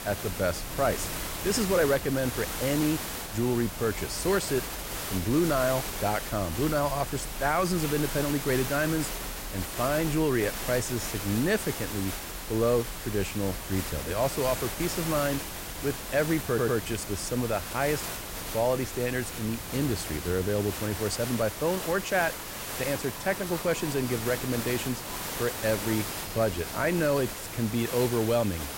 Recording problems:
hiss; loud; throughout; 6 dB below the speech
wind in the background; noticeable; throughout; 15 dB below the speech
crackling; very faint; from 10 to 13 s, from 16 to 18 s and from 19 to 20 s; 25 dB below the speech
audio stuttering; at 16 s

